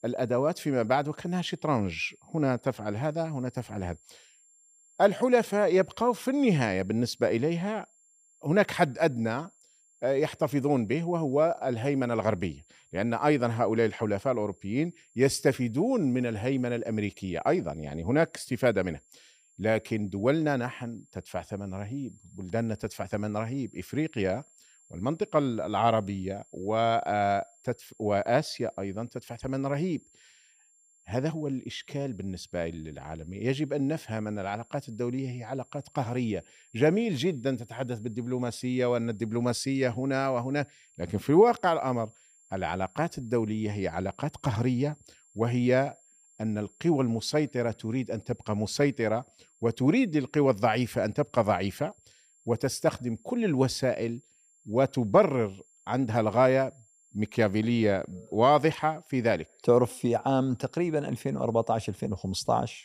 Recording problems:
high-pitched whine; faint; throughout; 7.5 kHz, 30 dB below the speech

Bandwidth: 15 kHz